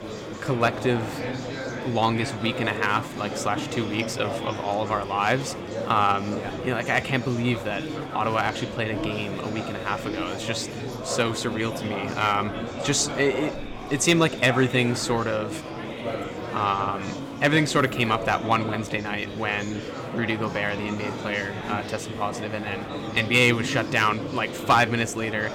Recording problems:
murmuring crowd; loud; throughout; 8 dB below the speech

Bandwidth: 17 kHz